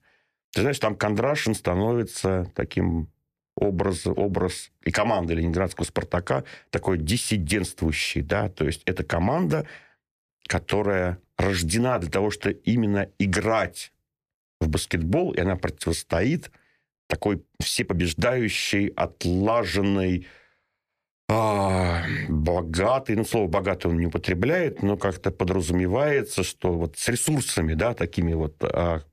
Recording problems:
uneven, jittery; strongly; from 17 to 25 s

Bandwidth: 14.5 kHz